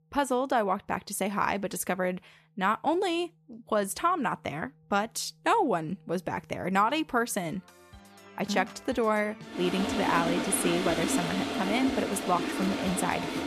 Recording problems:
household noises; loud; from 9.5 s on; 2 dB below the speech
background music; noticeable; throughout; 20 dB below the speech

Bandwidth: 14 kHz